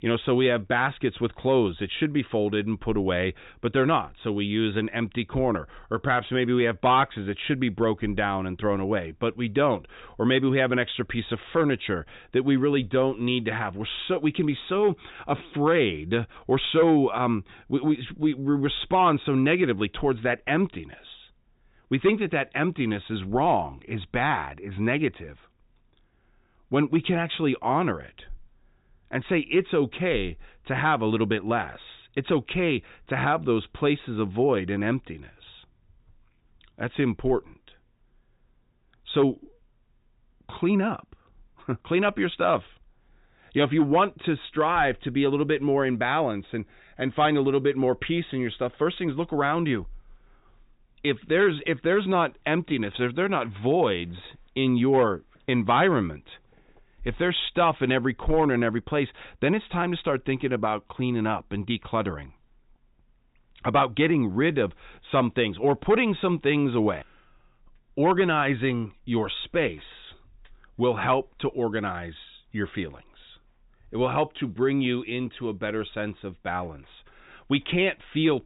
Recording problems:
high frequencies cut off; severe; nothing above 4 kHz

